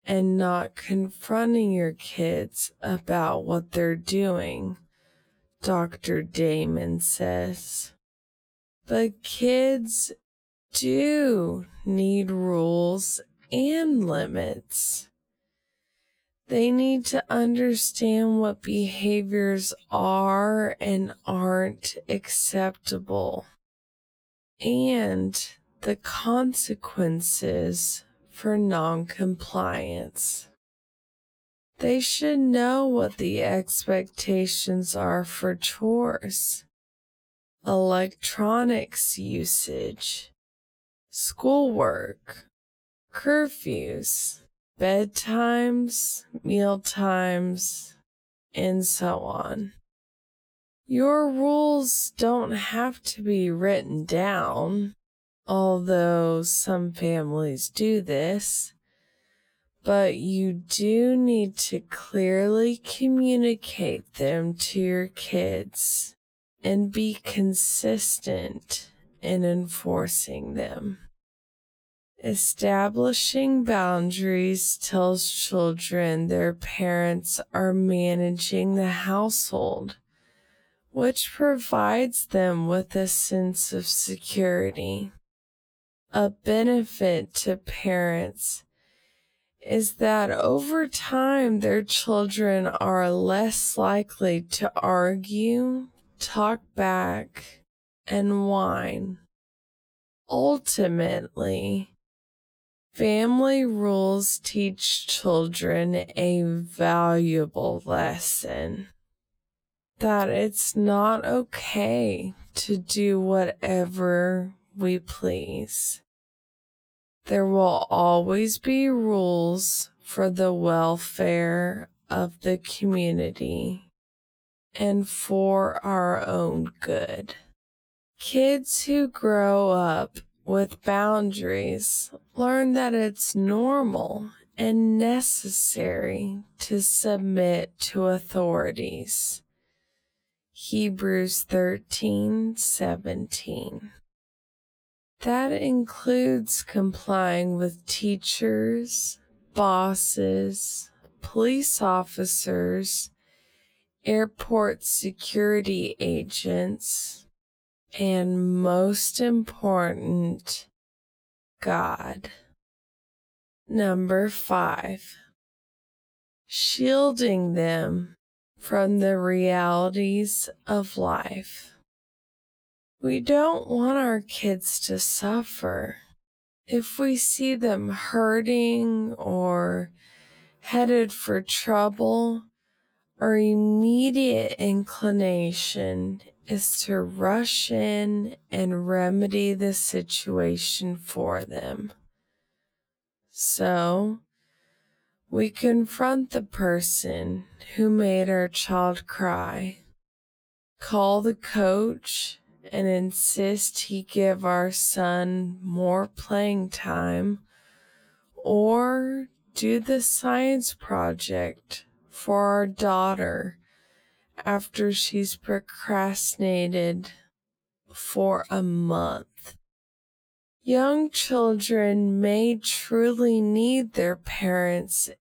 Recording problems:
wrong speed, natural pitch; too slow; 0.5 times normal speed

